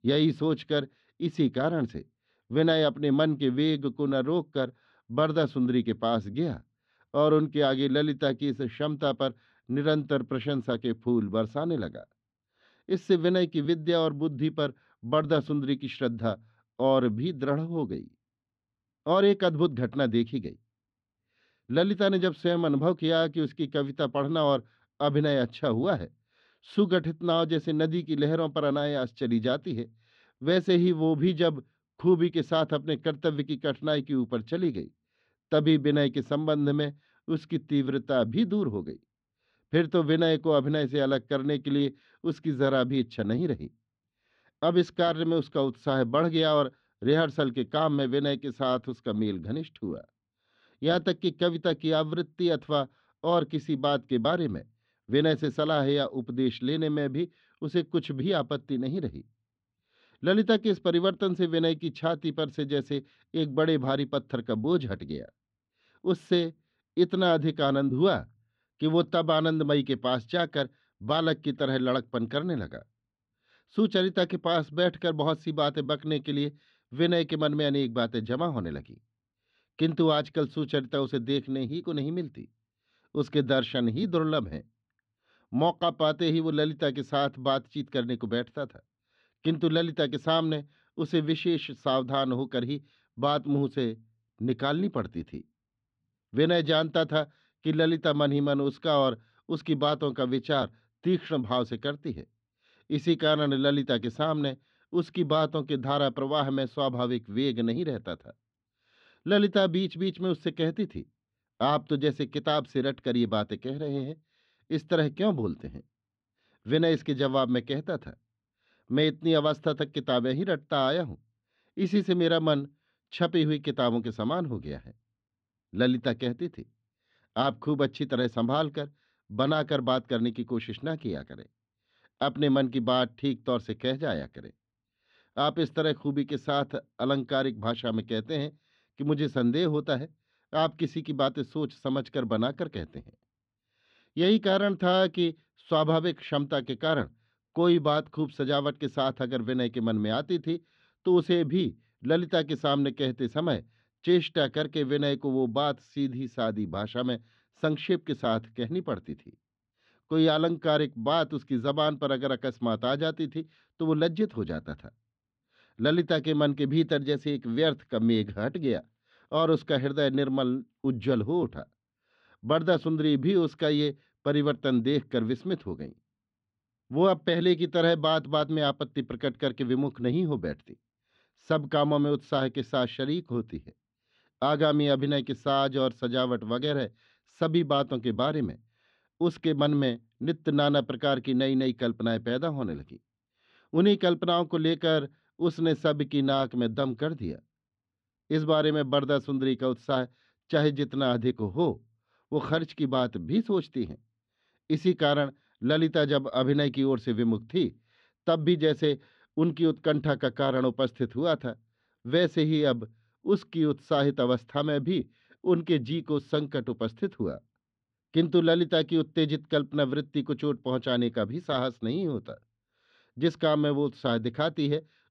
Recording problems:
muffled; slightly; fading above 3.5 kHz

